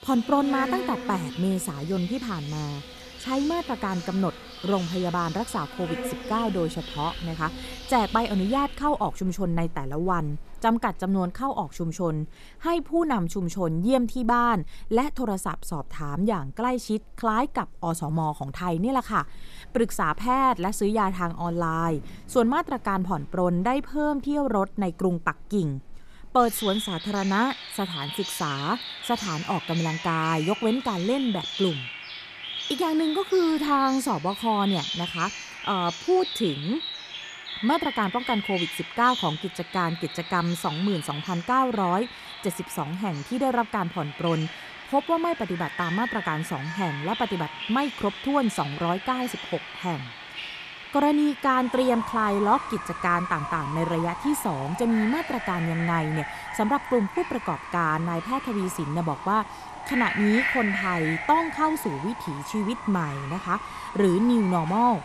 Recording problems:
animal sounds; loud; throughout; 8 dB below the speech

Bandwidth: 14 kHz